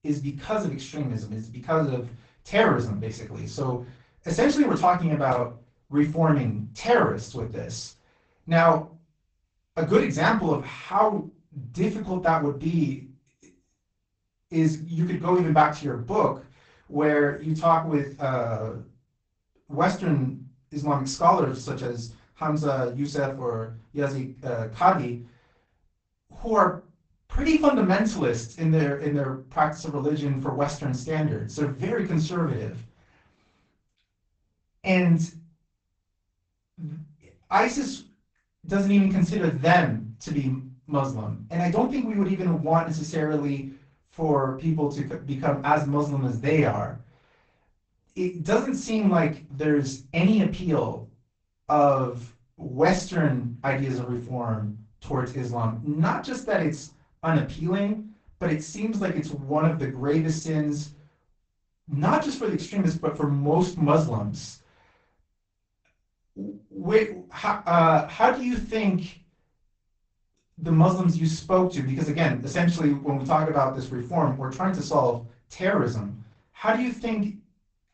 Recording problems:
off-mic speech; far
garbled, watery; badly; nothing above 8 kHz
room echo; slight; dies away in 0.3 s

